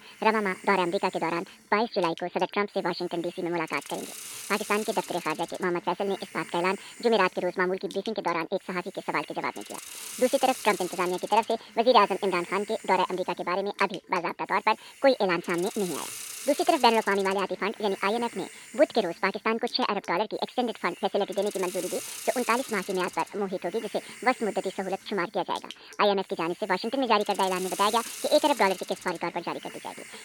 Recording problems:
high frequencies cut off; severe; nothing above 5 kHz
wrong speed and pitch; too fast and too high; 1.5 times normal speed
hiss; noticeable; throughout; 15 dB below the speech

